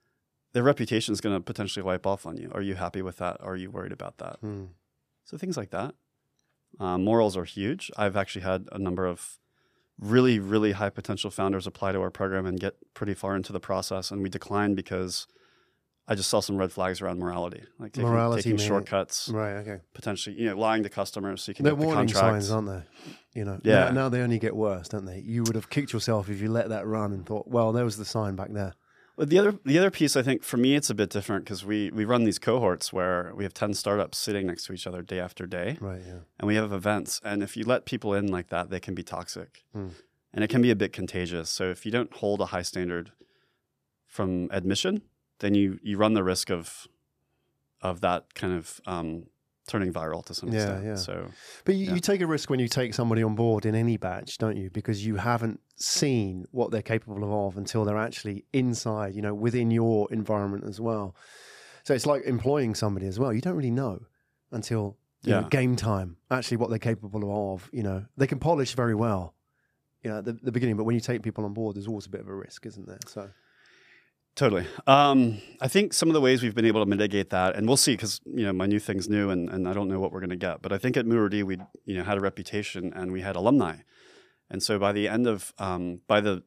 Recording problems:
none

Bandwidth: 14.5 kHz